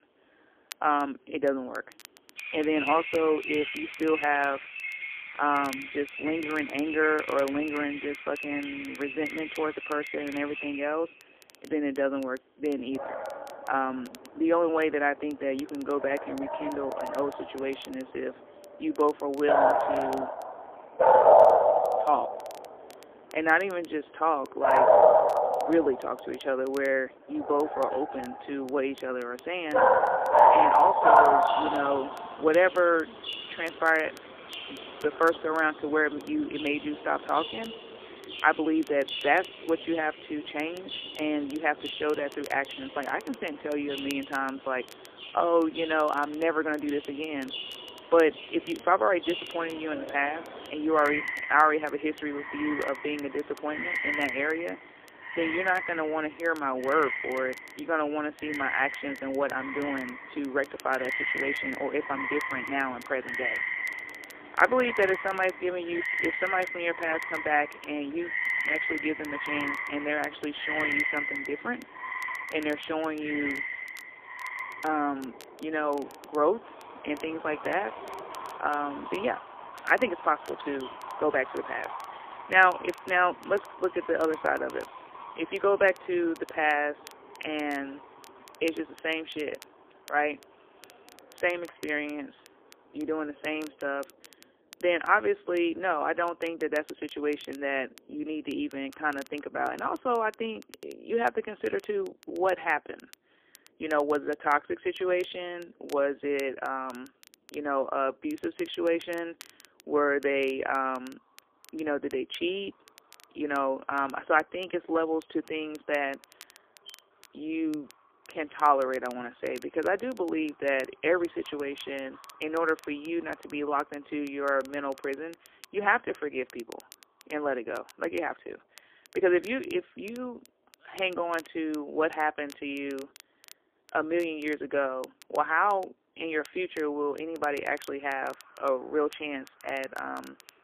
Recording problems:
phone-call audio; poor line; nothing above 3 kHz
animal sounds; very loud; throughout; as loud as the speech
crackle, like an old record; faint; 25 dB below the speech

